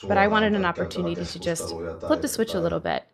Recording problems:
voice in the background; loud; throughout; 9 dB below the speech

